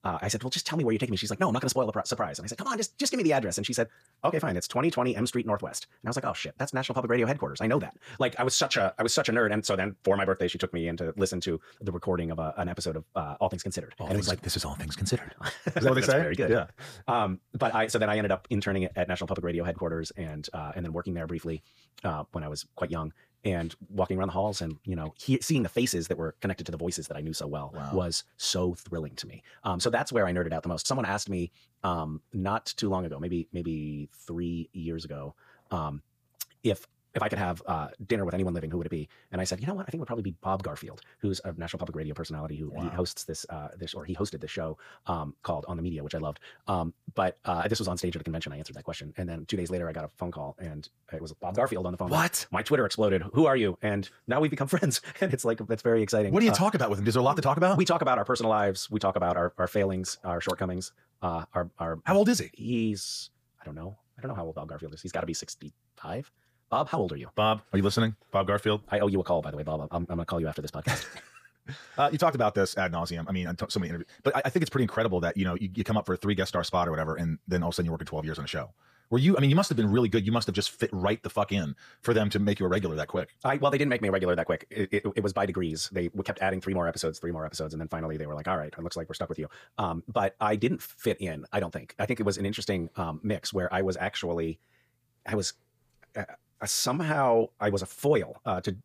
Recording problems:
wrong speed, natural pitch; too fast; 1.6 times normal speed

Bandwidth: 15 kHz